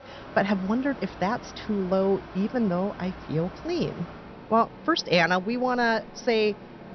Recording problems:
high frequencies cut off; noticeable; nothing above 6 kHz
machinery noise; noticeable; throughout; 15 dB below the speech

